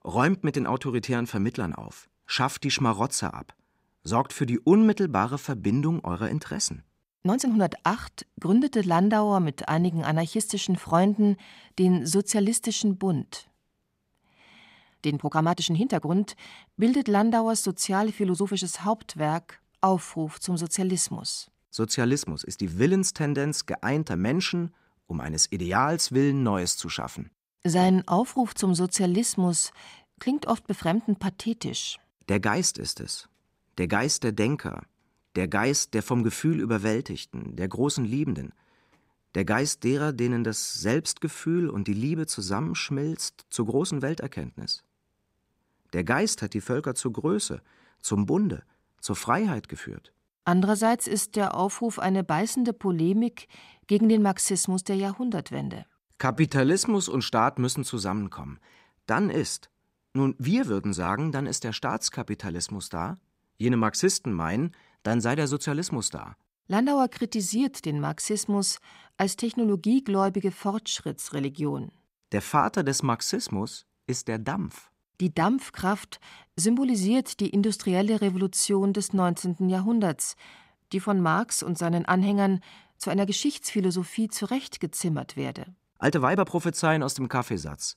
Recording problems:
uneven, jittery; strongly; from 7 s to 1:26

